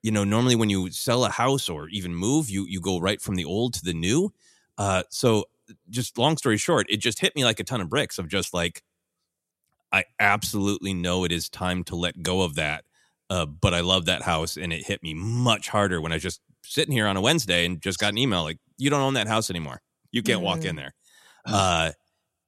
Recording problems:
none

